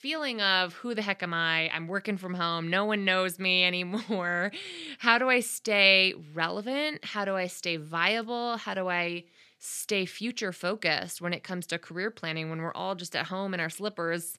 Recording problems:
none

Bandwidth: 14 kHz